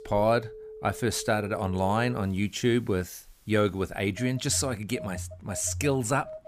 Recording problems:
alarms or sirens; noticeable; throughout; 15 dB below the speech

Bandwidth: 15 kHz